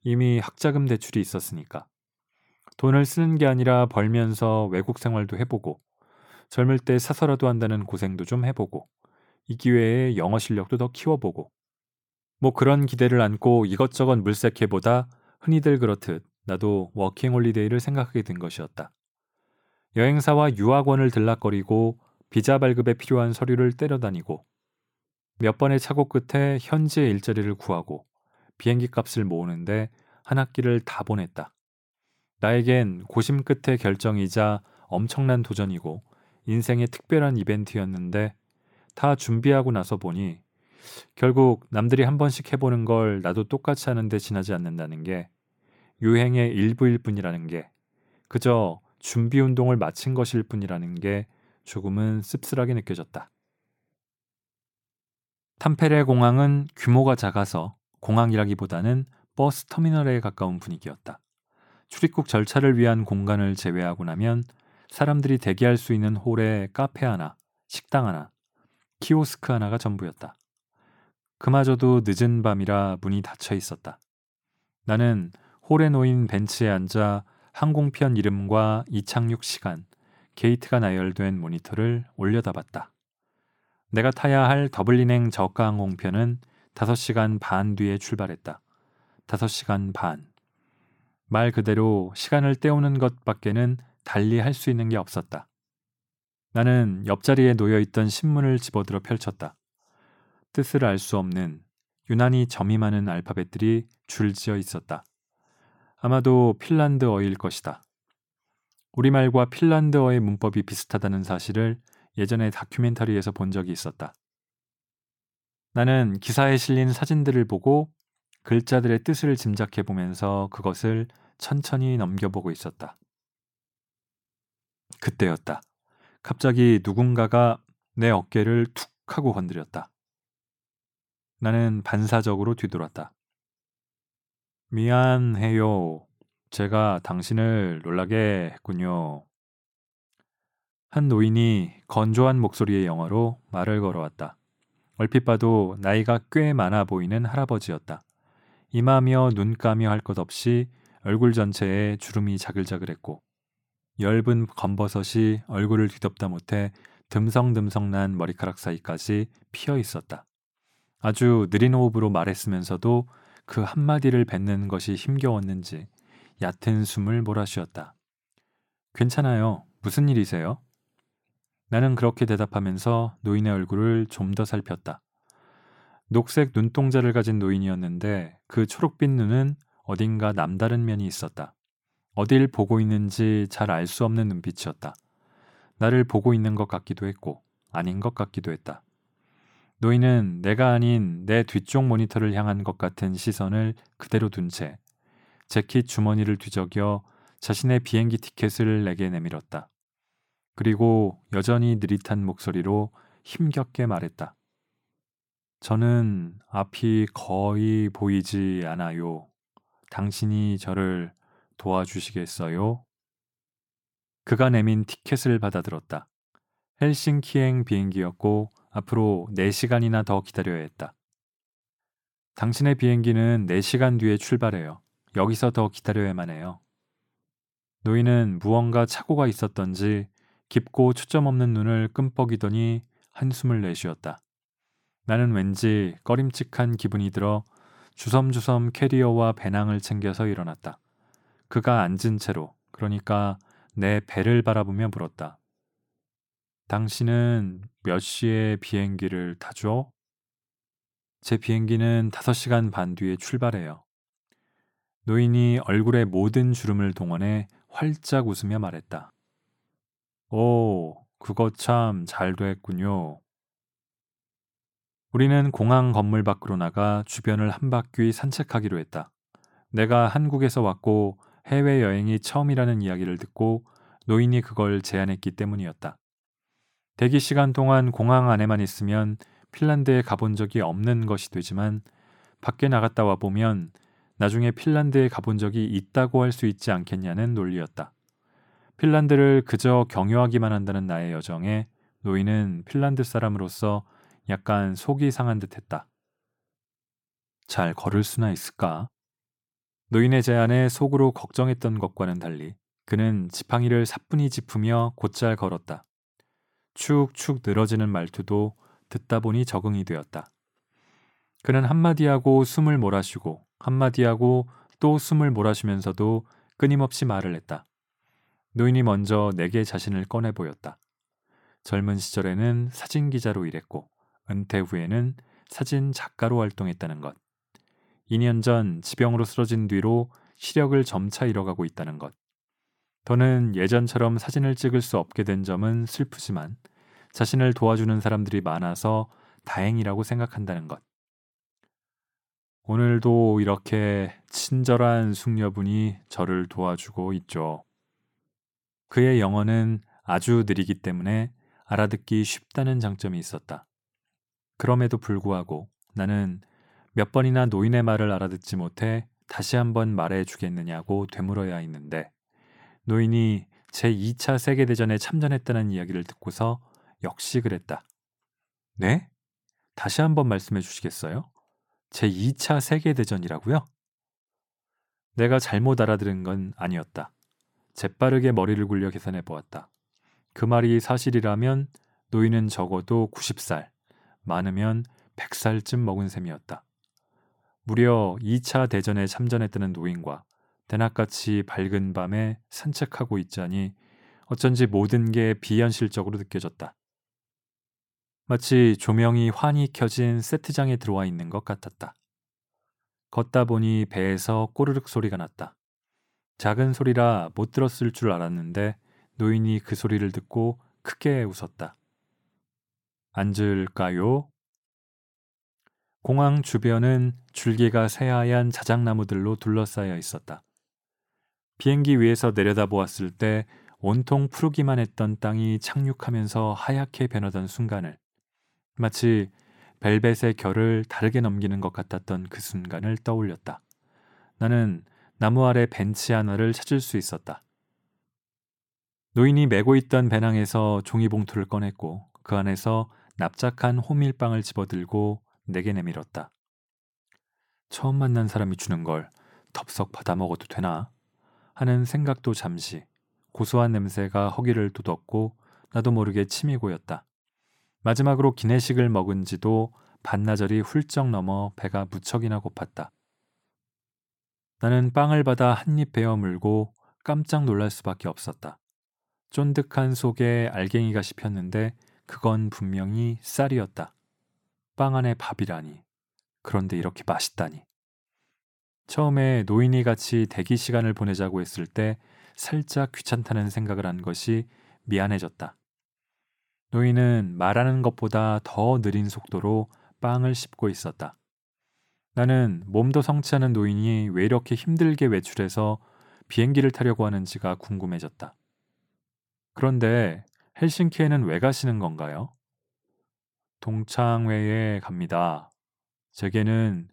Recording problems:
none

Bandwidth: 17.5 kHz